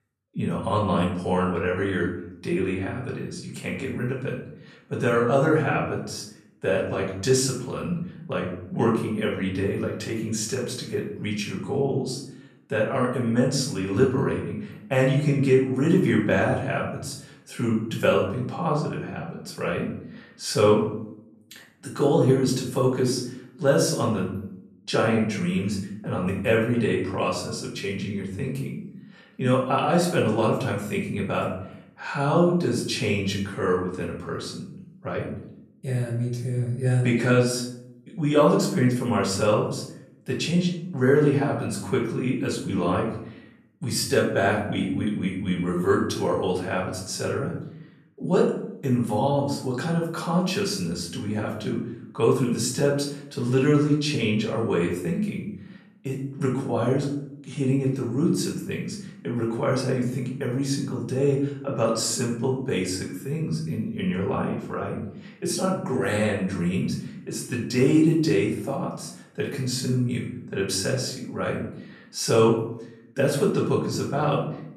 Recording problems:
off-mic speech; far
room echo; noticeable; dies away in 0.6 s

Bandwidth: 13.5 kHz